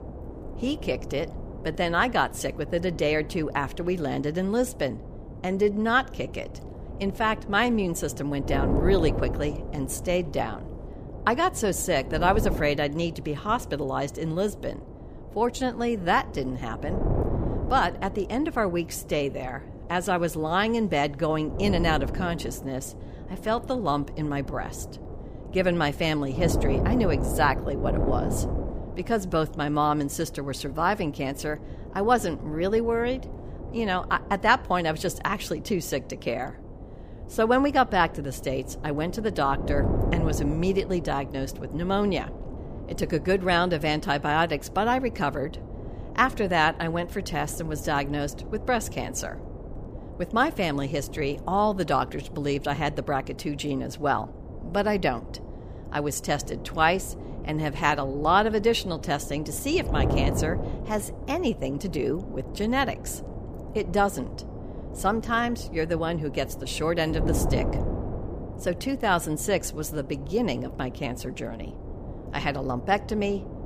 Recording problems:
wind noise on the microphone; occasional gusts; 15 dB below the speech

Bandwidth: 15 kHz